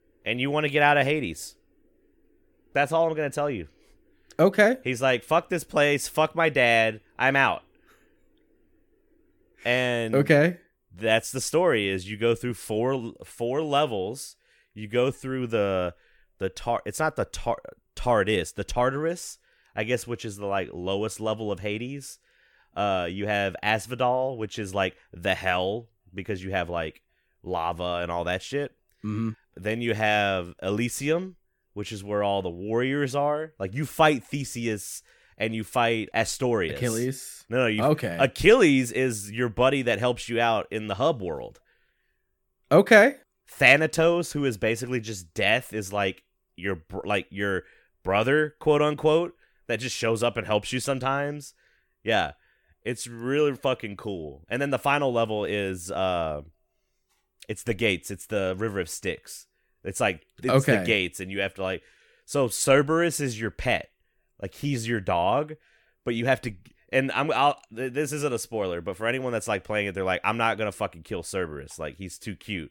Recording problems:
none

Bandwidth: 17.5 kHz